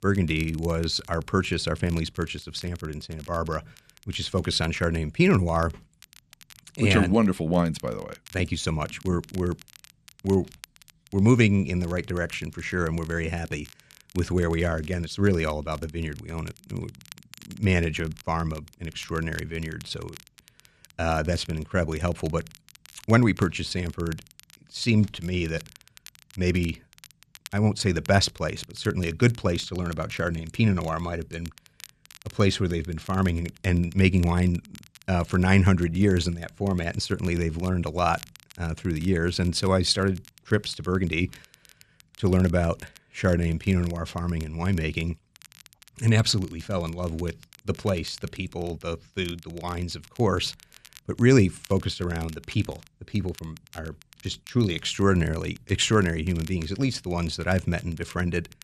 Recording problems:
crackle, like an old record; faint; 25 dB below the speech

